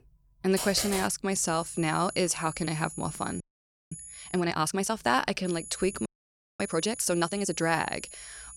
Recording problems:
high-pitched whine; noticeable; from 1.5 to 4.5 s and from 5.5 s on; 10 kHz, 15 dB below the speech
keyboard typing; noticeable; at 0.5 s; peak 3 dB below the speech
audio freezing; at 3.5 s for 0.5 s and at 6 s for 0.5 s

